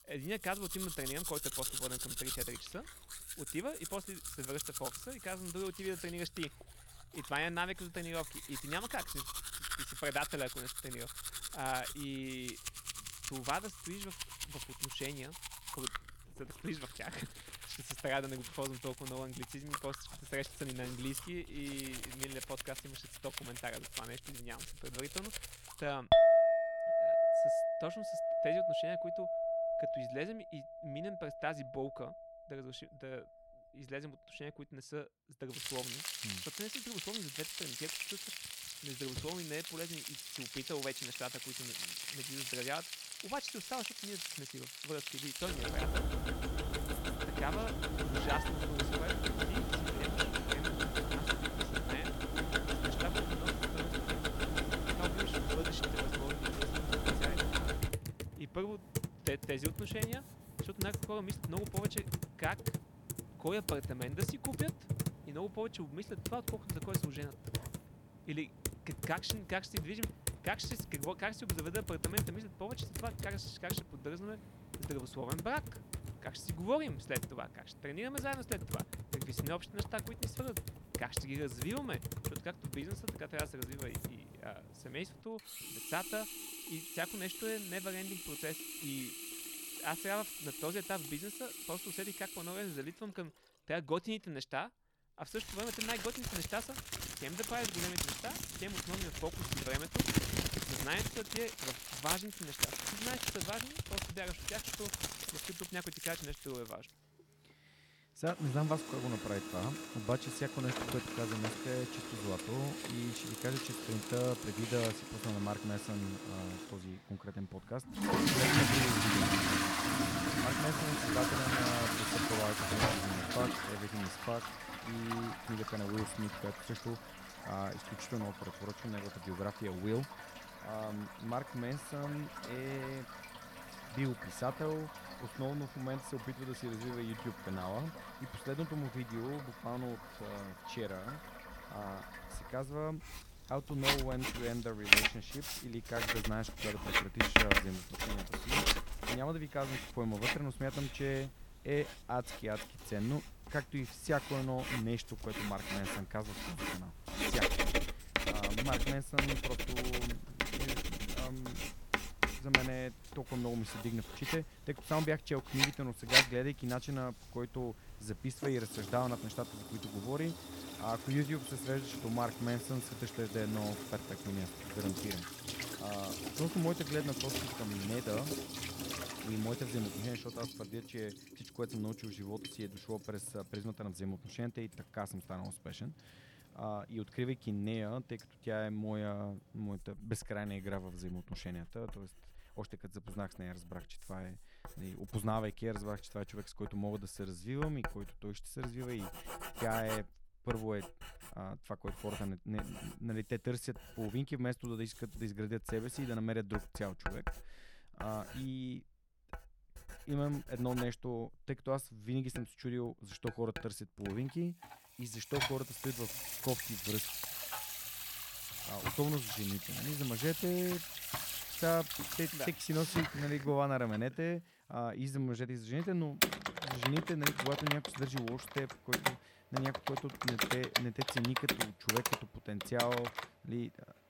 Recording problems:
household noises; very loud; throughout; 3 dB above the speech

